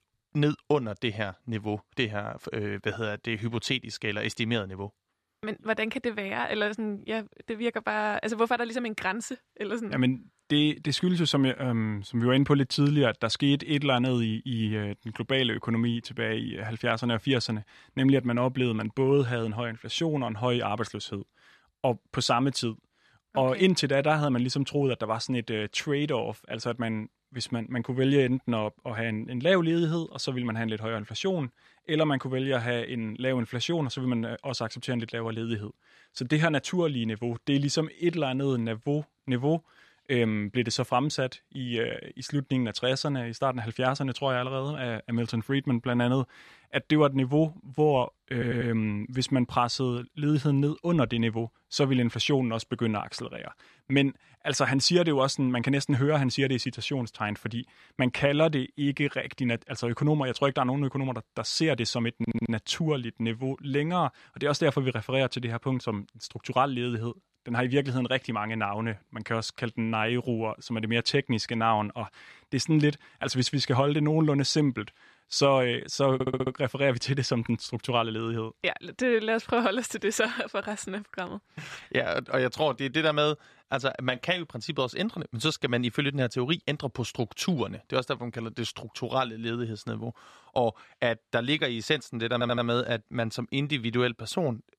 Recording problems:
audio stuttering; 4 times, first at 48 s

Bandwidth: 13.5 kHz